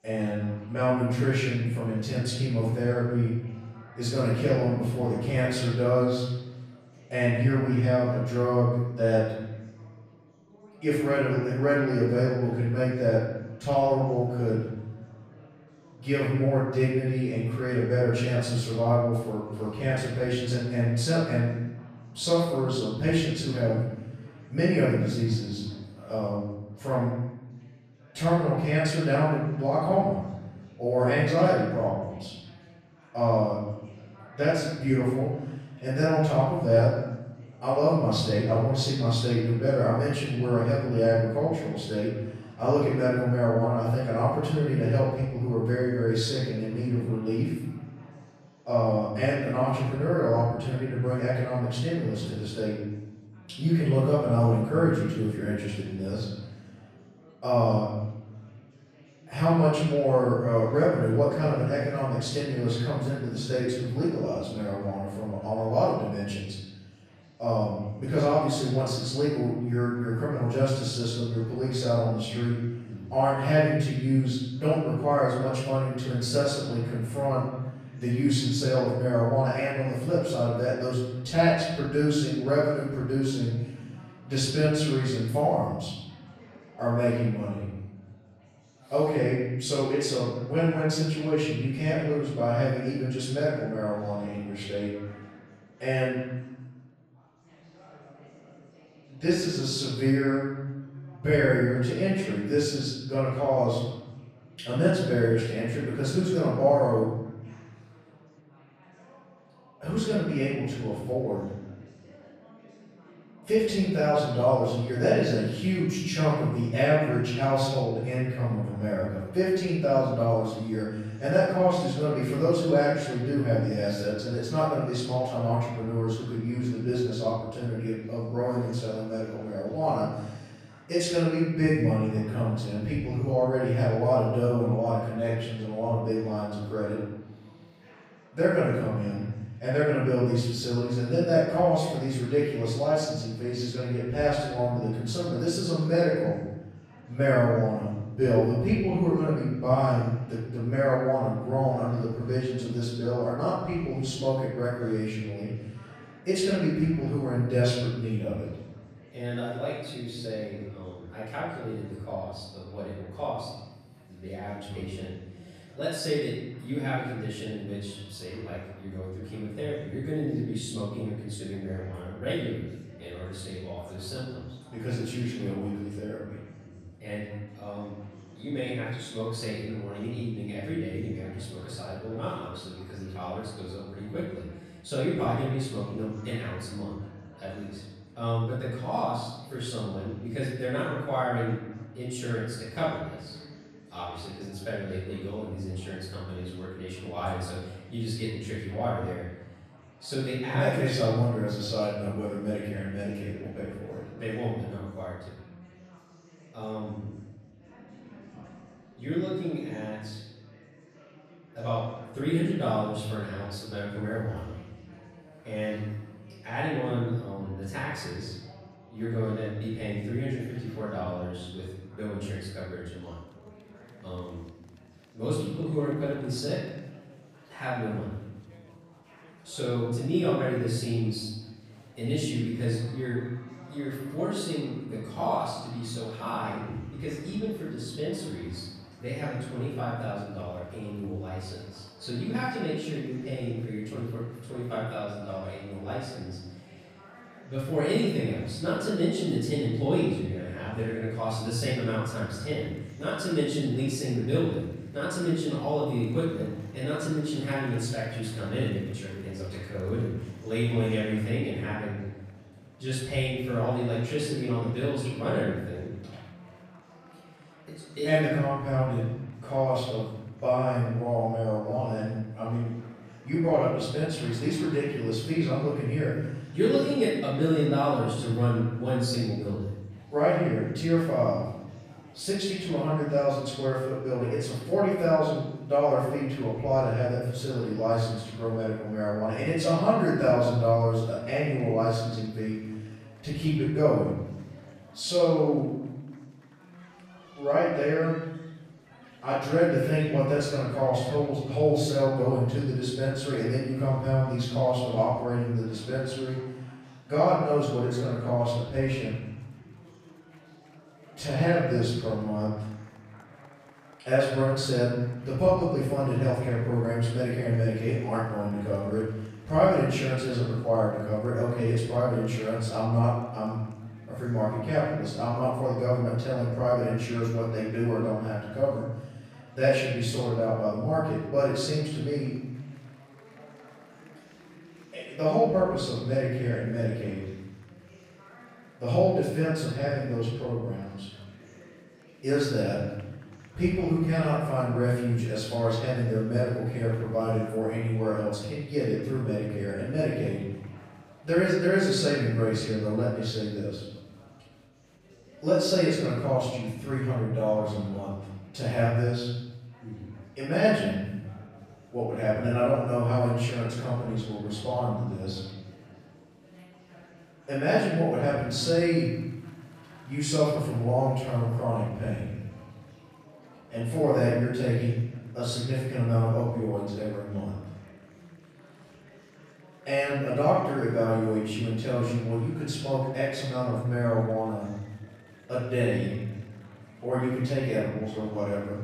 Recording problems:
room echo; strong; dies away in 1.1 s
off-mic speech; far
chatter from many people; faint; throughout; 25 dB below the speech

